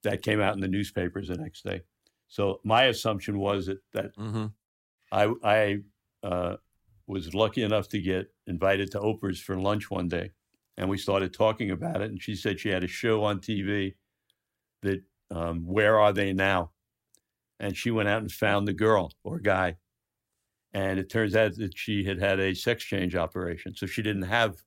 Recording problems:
none

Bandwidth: 16 kHz